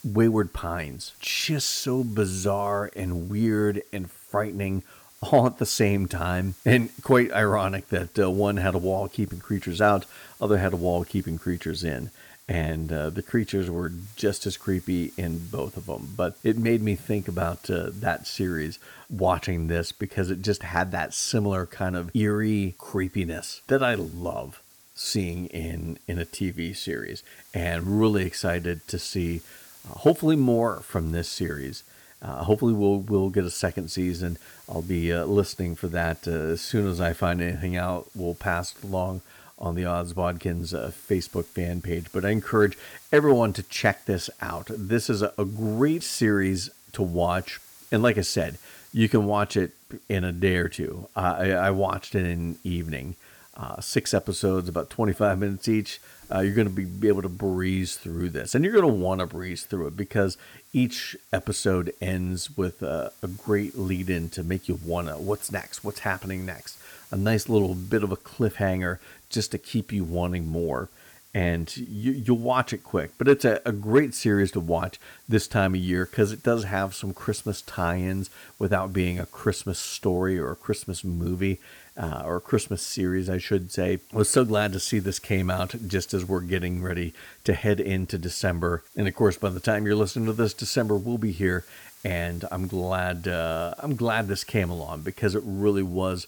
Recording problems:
hiss; faint; throughout; 25 dB below the speech

